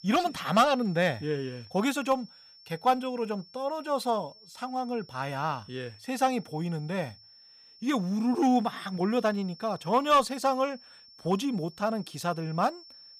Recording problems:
high-pitched whine; faint; throughout; 5.5 kHz, 20 dB below the speech

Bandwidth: 15.5 kHz